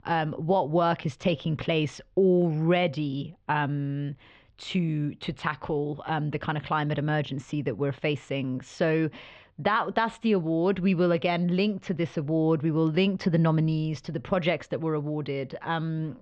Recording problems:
muffled; very; fading above 3.5 kHz

